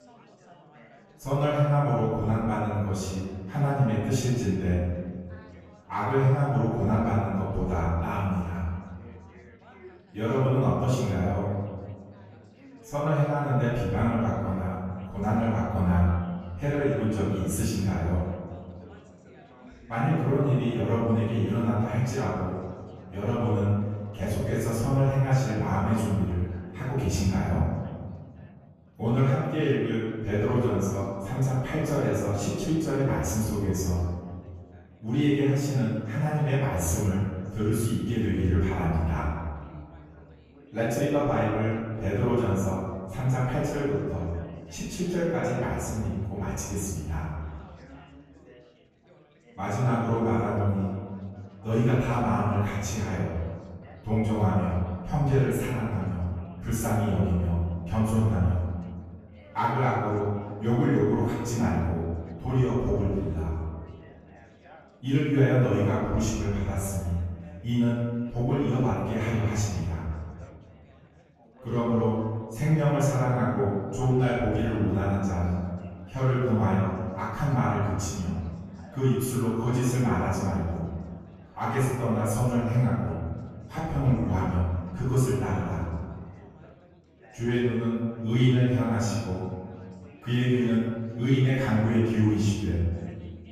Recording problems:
room echo; strong; dies away in 1.6 s
off-mic speech; far
chatter from many people; faint; throughout; 25 dB below the speech

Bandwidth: 14.5 kHz